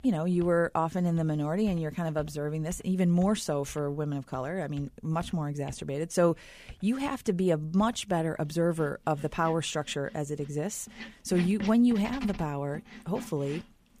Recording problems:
household noises; noticeable; throughout; 15 dB below the speech

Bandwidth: 15 kHz